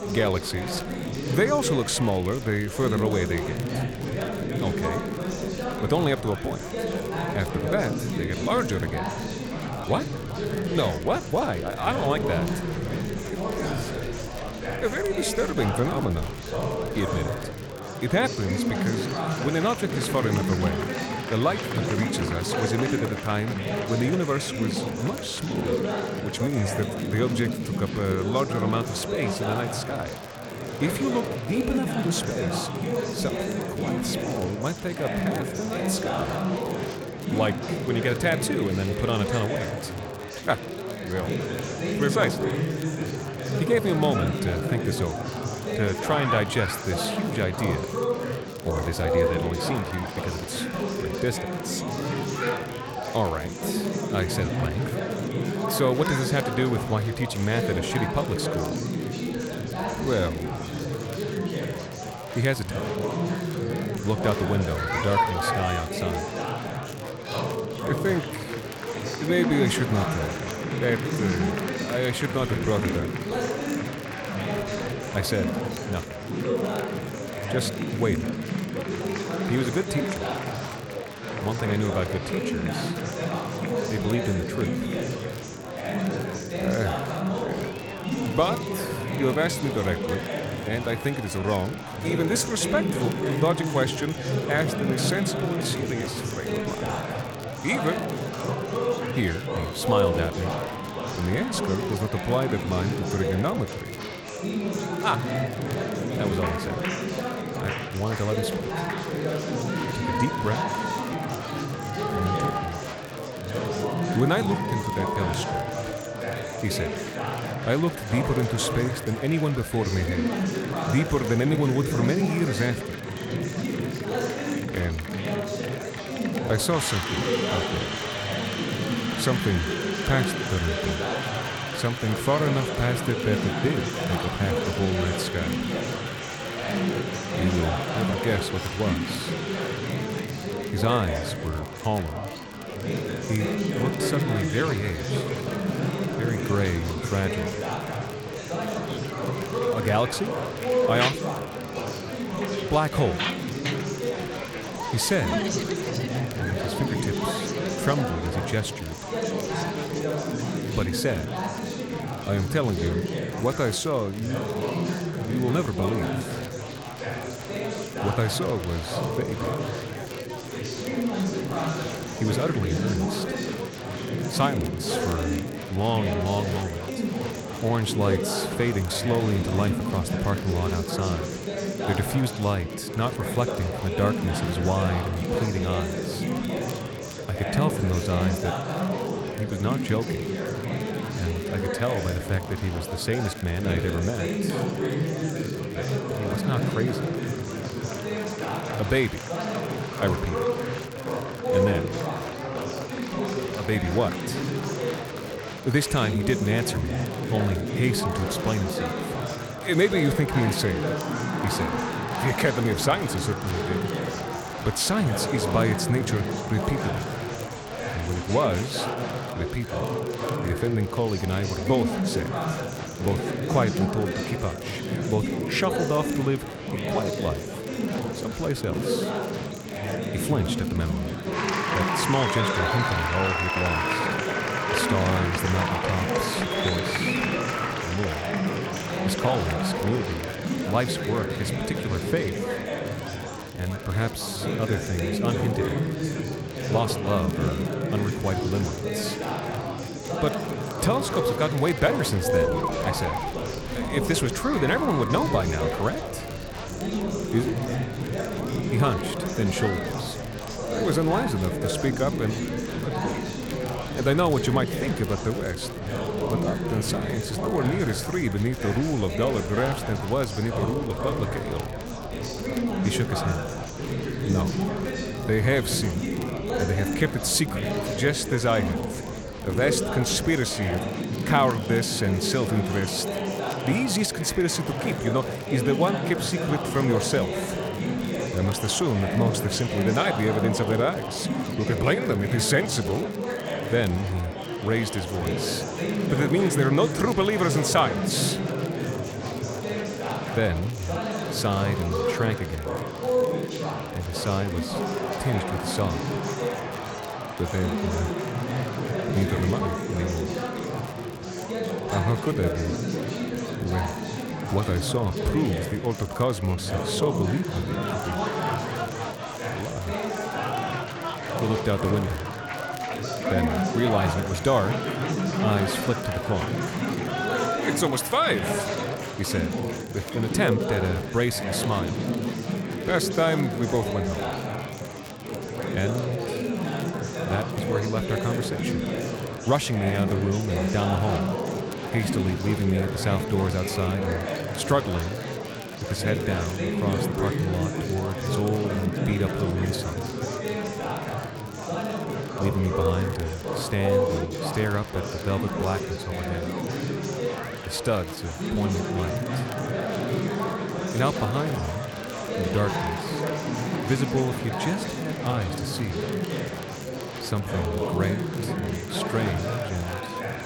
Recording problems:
murmuring crowd; loud; throughout; 1 dB below the speech
crackle, like an old record; faint; 20 dB below the speech

